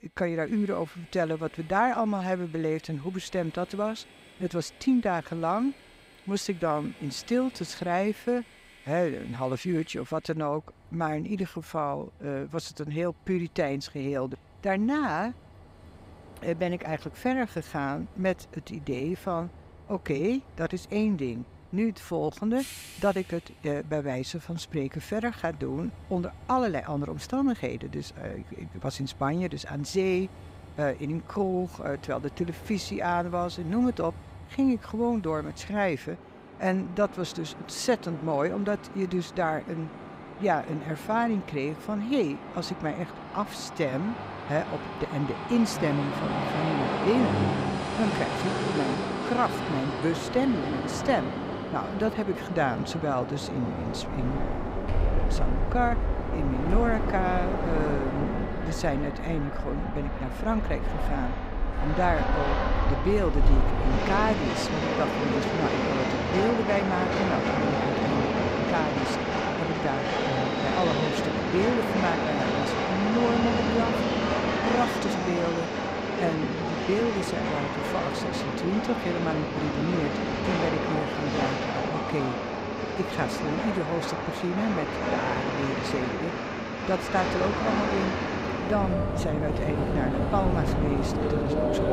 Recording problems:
train or aircraft noise; very loud; throughout; 1 dB above the speech

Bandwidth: 15.5 kHz